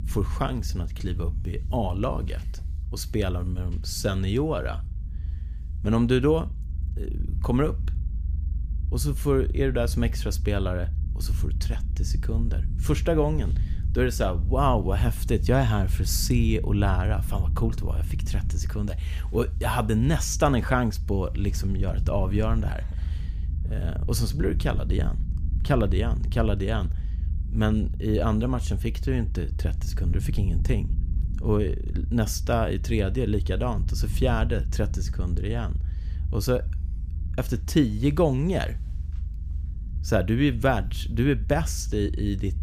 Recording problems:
low rumble; noticeable; throughout; 20 dB below the speech

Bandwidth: 15 kHz